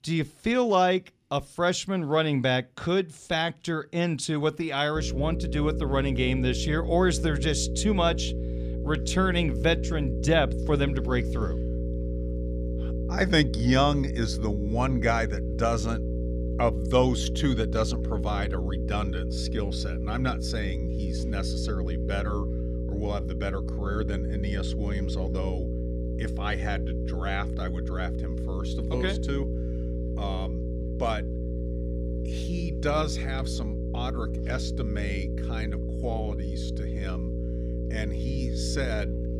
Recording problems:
electrical hum; loud; from 5 s on; 60 Hz, 9 dB below the speech

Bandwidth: 15 kHz